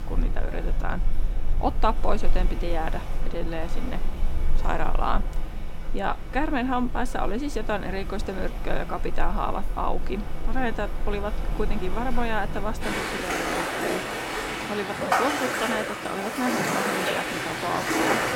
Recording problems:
rain or running water; very loud; throughout; 1 dB above the speech

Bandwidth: 16 kHz